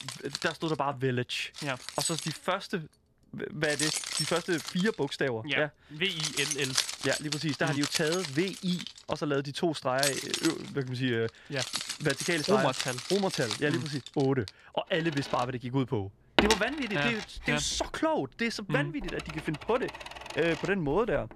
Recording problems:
household noises; loud; throughout; 3 dB below the speech

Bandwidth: 14 kHz